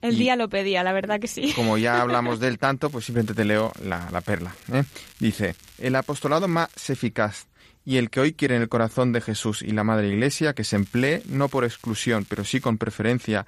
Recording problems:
crackling; faint; from 3 to 7 s and from 11 to 13 s; 25 dB below the speech

